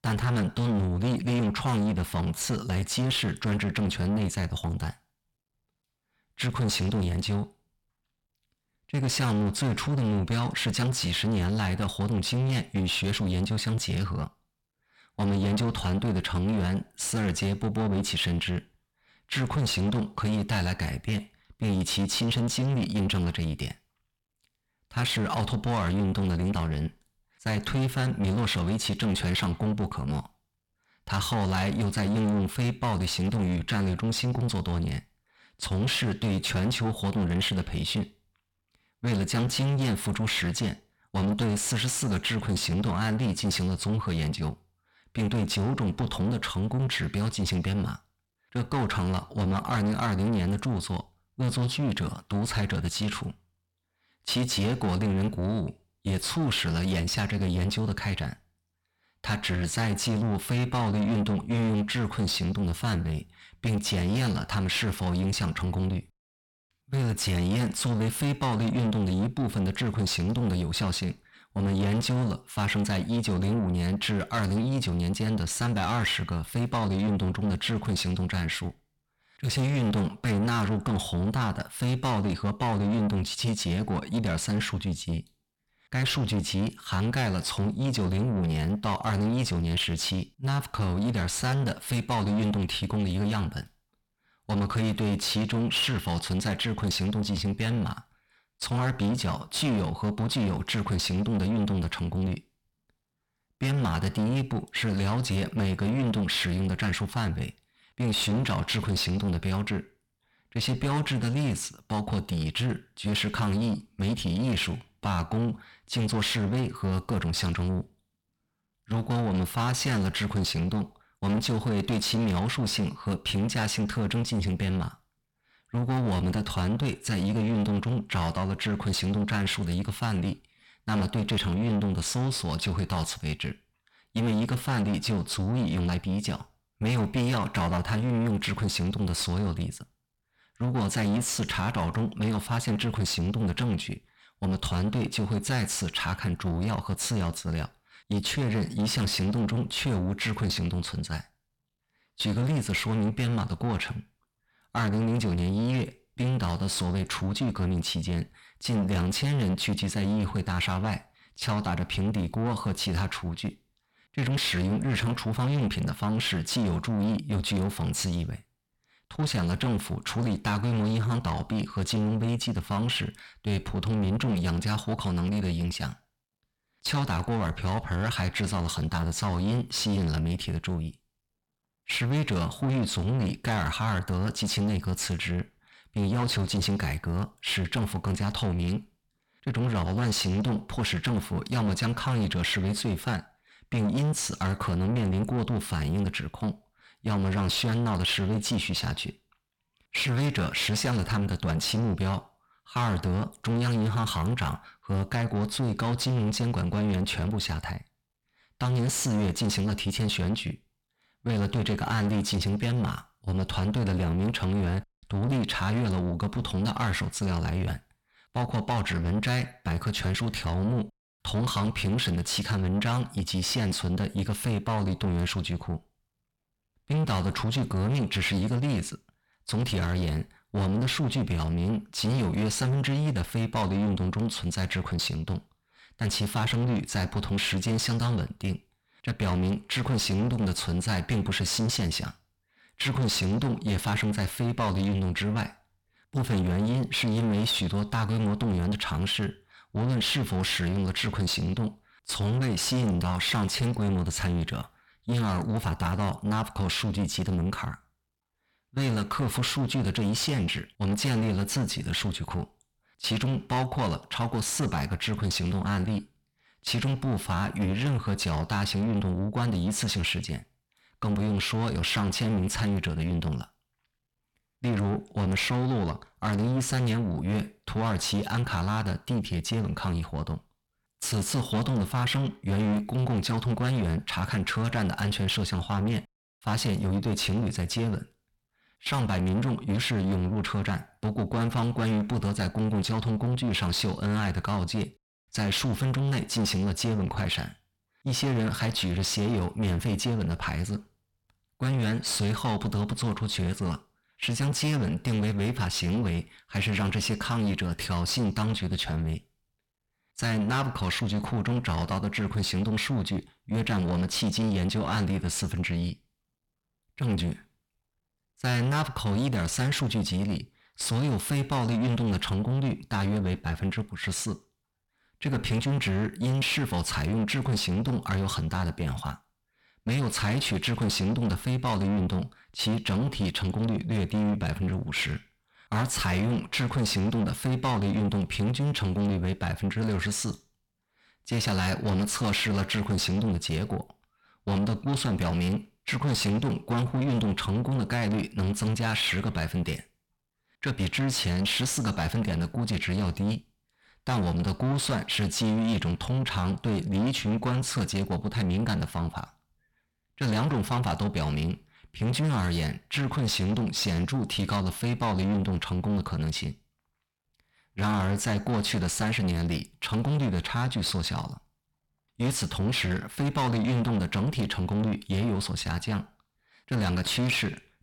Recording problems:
distortion; heavy; 7 dB below the speech

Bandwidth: 17.5 kHz